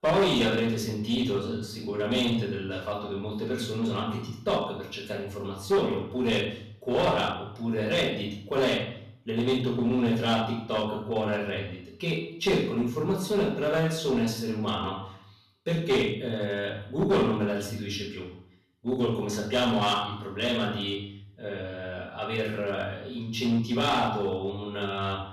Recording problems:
off-mic speech; far
room echo; noticeable; dies away in 0.6 s
distortion; slight; 6% of the sound clipped

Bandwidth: 13.5 kHz